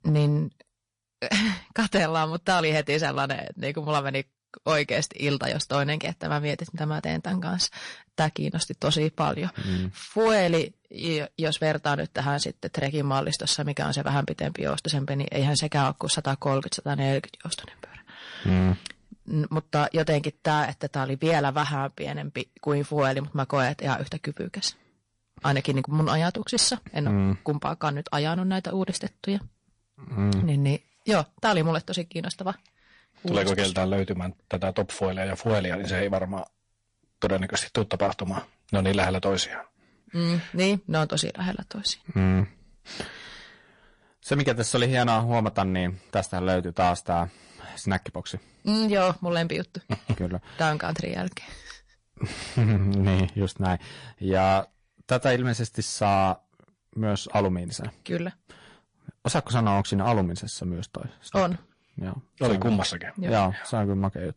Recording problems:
distortion; slight; 6% of the sound clipped
garbled, watery; slightly; nothing above 10 kHz

